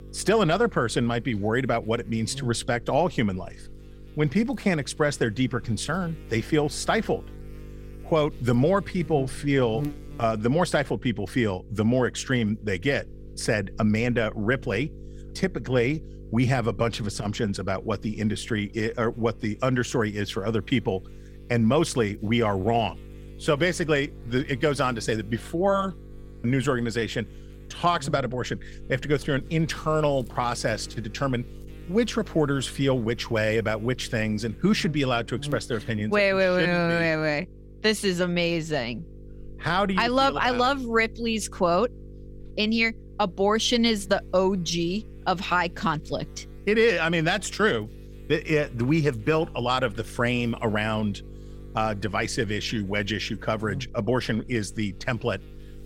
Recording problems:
electrical hum; faint; throughout; 50 Hz, 25 dB below the speech

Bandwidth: 16 kHz